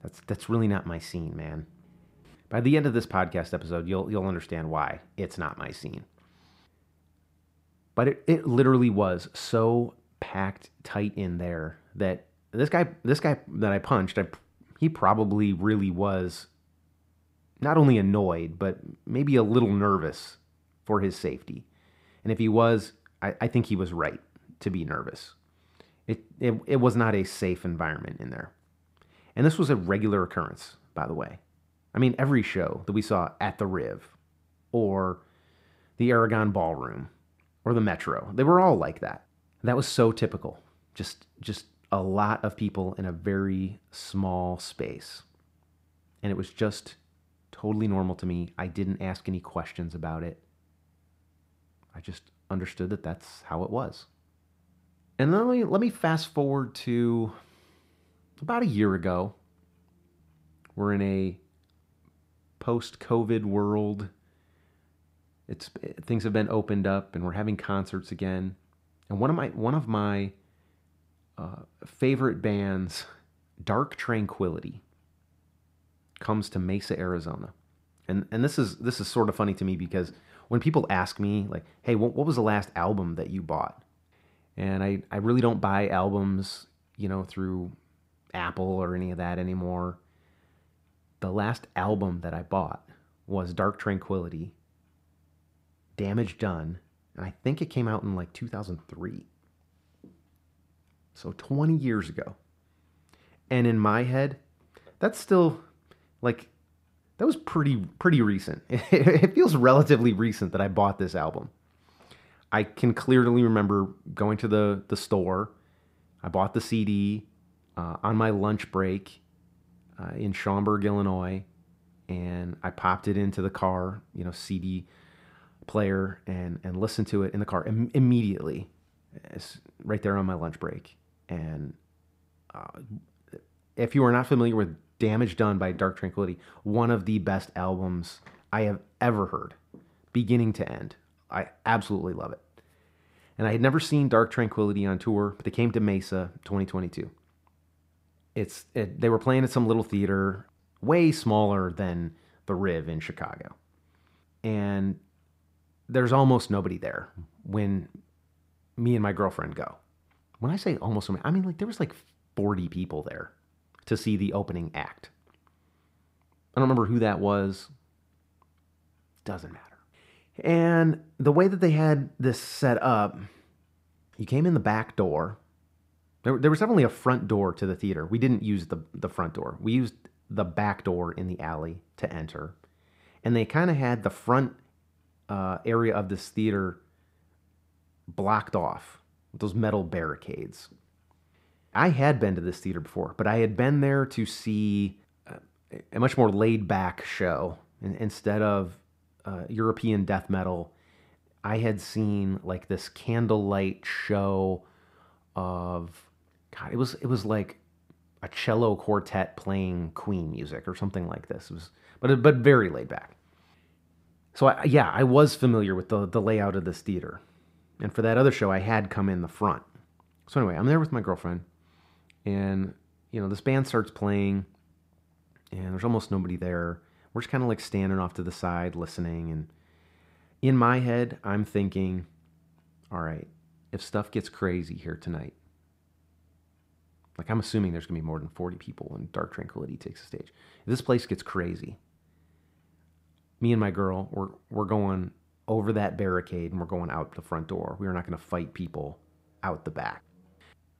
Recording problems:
muffled; slightly; fading above 2 kHz

